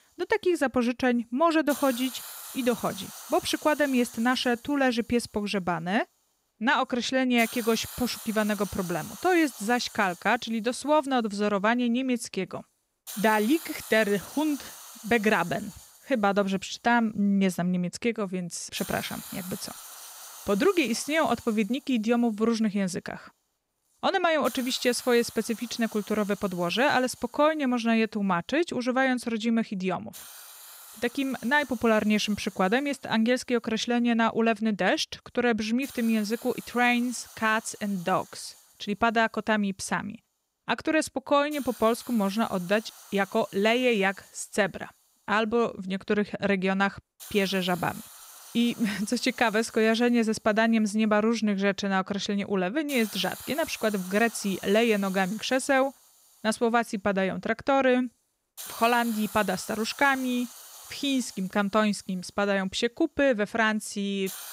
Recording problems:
hiss; noticeable; throughout; 15 dB below the speech

